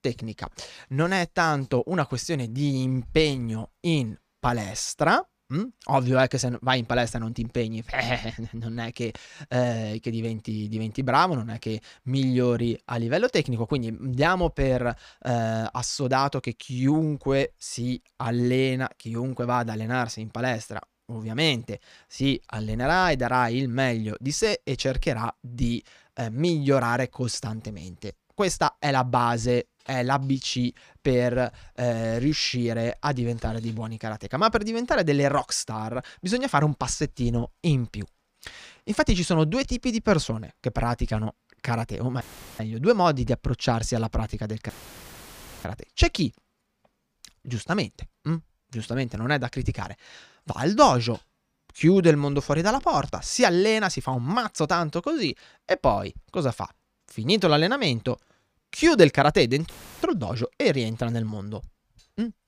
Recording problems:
audio cutting out; filled with static; at 42 s, at 45 s for 1 s and at 1:00

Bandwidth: 15 kHz